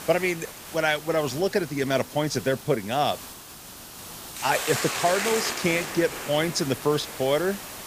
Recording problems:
hiss; loud; throughout; 7 dB below the speech

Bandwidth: 15 kHz